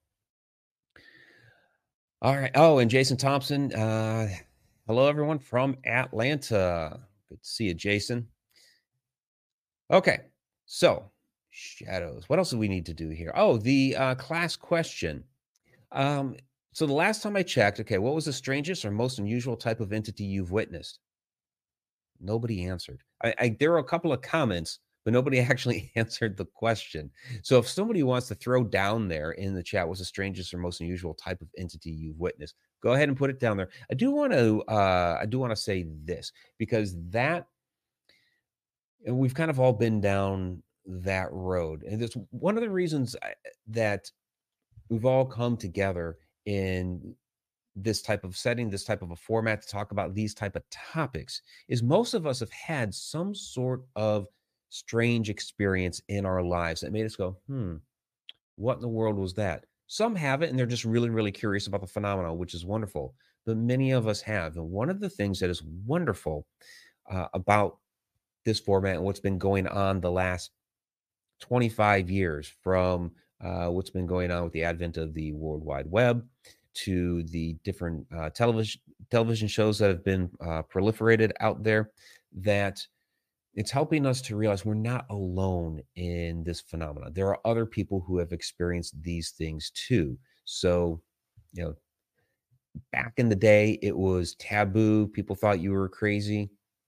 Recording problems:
none

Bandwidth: 15 kHz